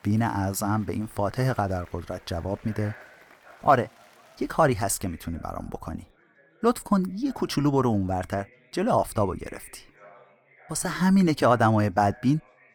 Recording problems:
chatter from many people; faint; throughout; 25 dB below the speech

